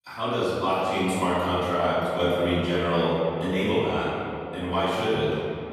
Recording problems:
room echo; strong; dies away in 2.3 s
off-mic speech; far
echo of what is said; noticeable; throughout; 550 ms later, 15 dB below the speech

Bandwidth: 14.5 kHz